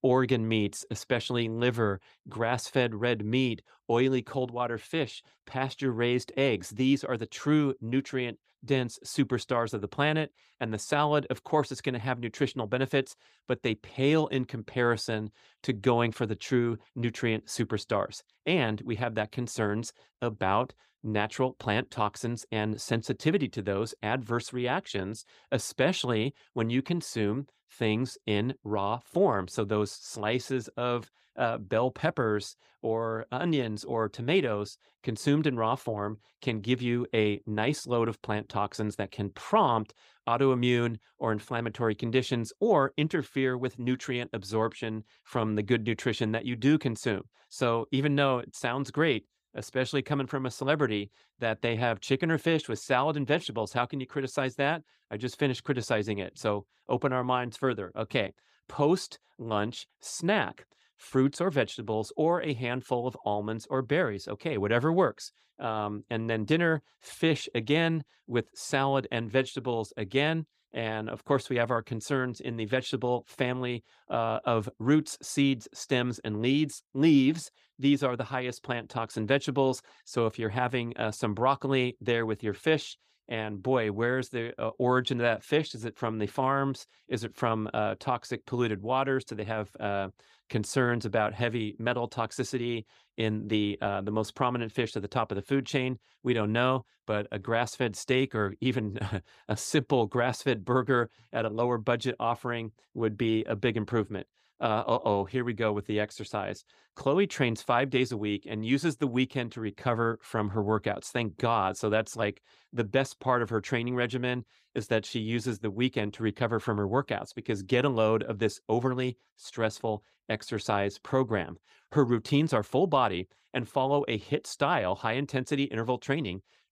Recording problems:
none

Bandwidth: 15 kHz